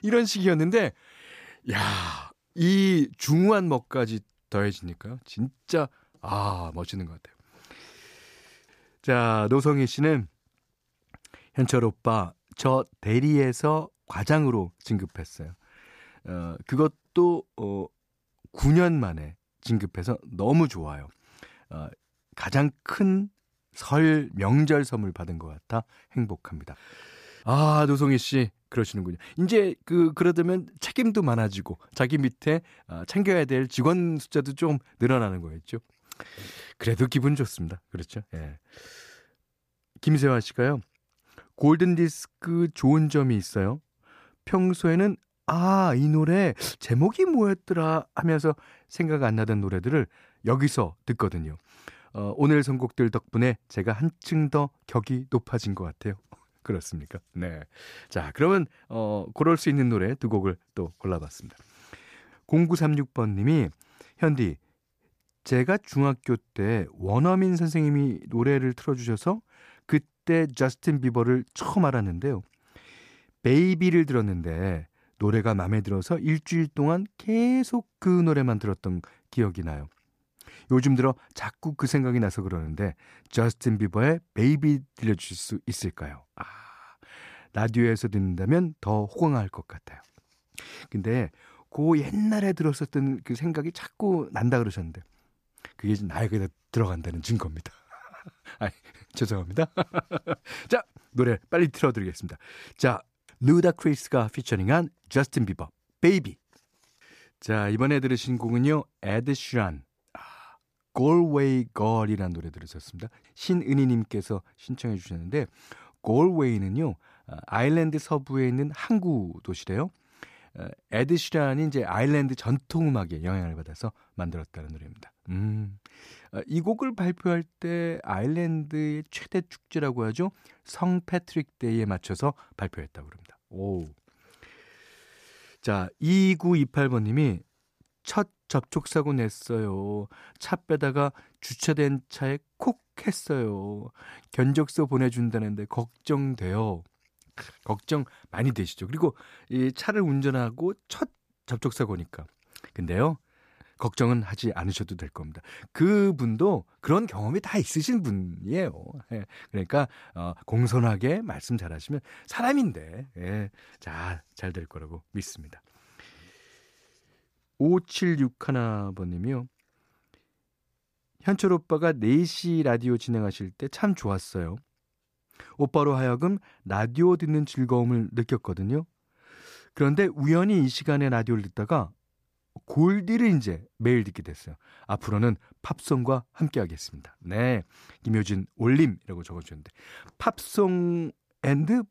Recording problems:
none

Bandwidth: 14.5 kHz